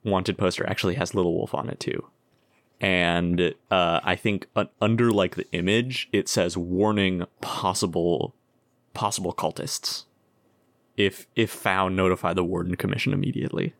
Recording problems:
none

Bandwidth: 17.5 kHz